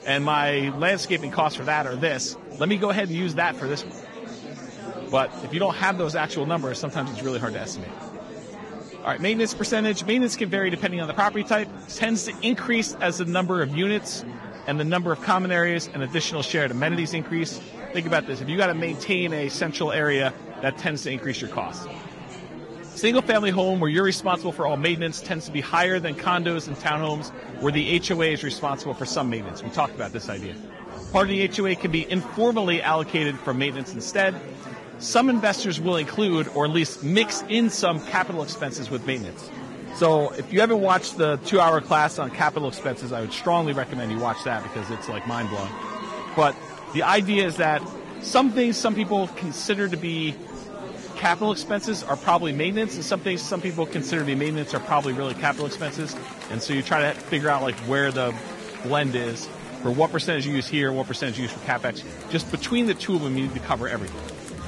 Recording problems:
garbled, watery; badly; nothing above 10.5 kHz
murmuring crowd; noticeable; throughout; 15 dB below the speech

